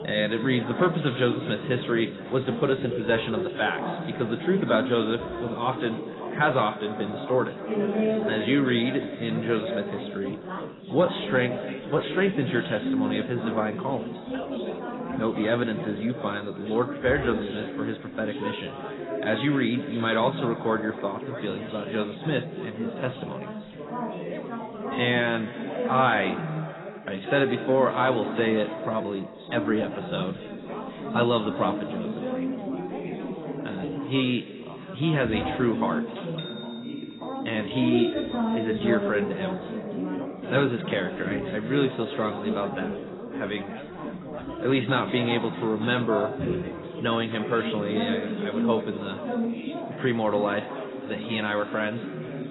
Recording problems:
garbled, watery; badly; nothing above 4 kHz
echo of what is said; noticeable; throughout; 240 ms later, 15 dB below the speech
background chatter; loud; throughout; 4 voices, 5 dB below the speech

